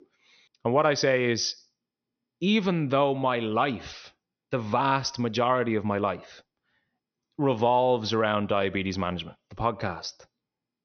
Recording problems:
high frequencies cut off; noticeable; nothing above 6 kHz

